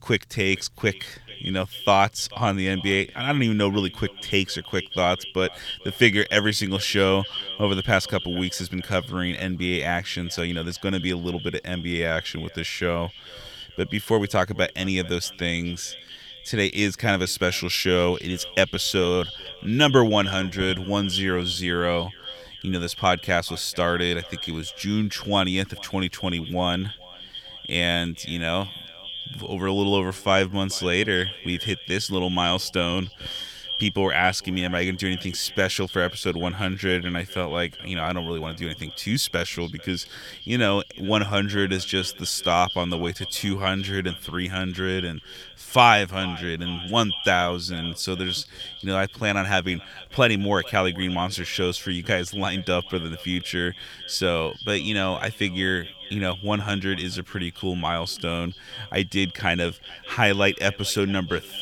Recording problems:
echo of what is said; strong; throughout; 440 ms later, 10 dB below the speech

